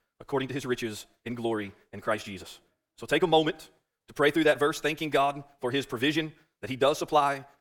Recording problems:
wrong speed, natural pitch; too fast; 1.7 times normal speed

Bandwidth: 17.5 kHz